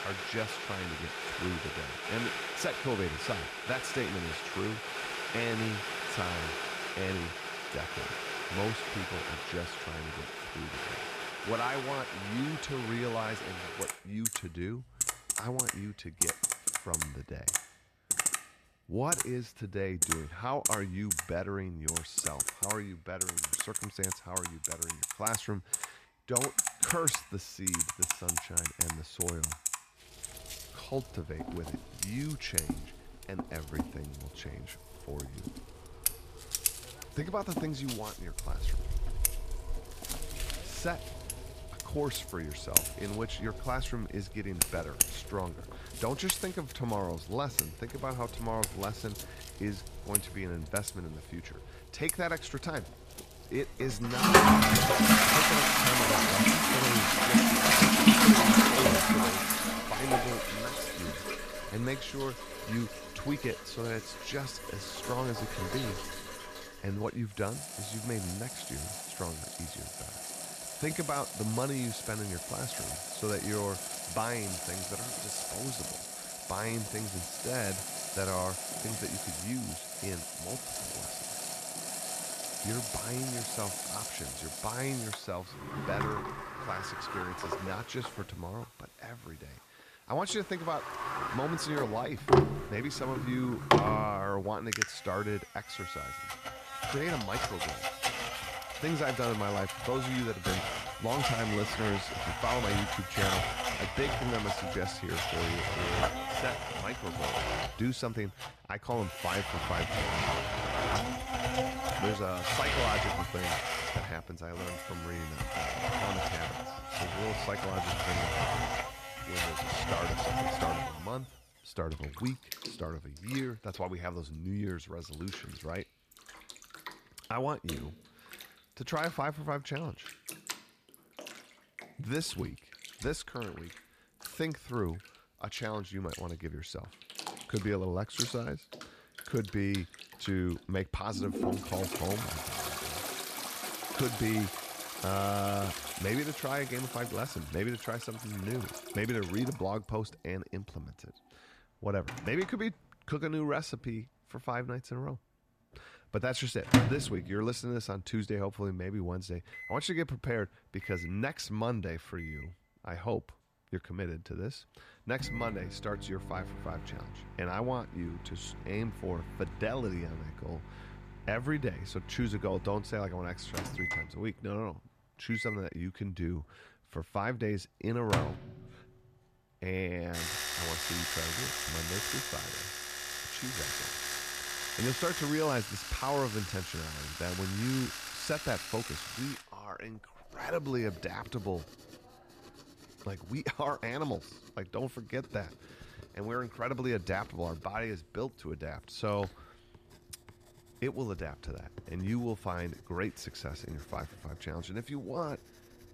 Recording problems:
household noises; very loud; throughout; 5 dB above the speech

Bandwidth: 14.5 kHz